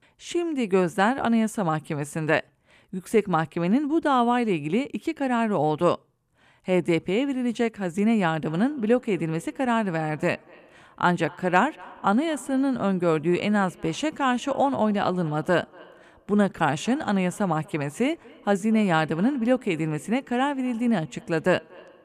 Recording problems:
echo of what is said; faint; from 8.5 s on; 240 ms later, 25 dB below the speech

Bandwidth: 14.5 kHz